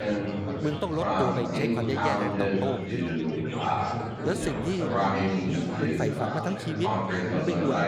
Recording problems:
chatter from many people; very loud; throughout; 4 dB above the speech

